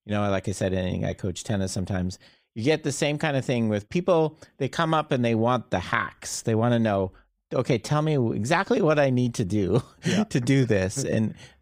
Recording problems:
none

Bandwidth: 15.5 kHz